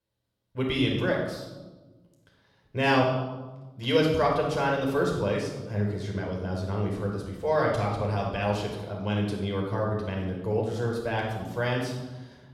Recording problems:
off-mic speech; far
room echo; noticeable; dies away in 1 s

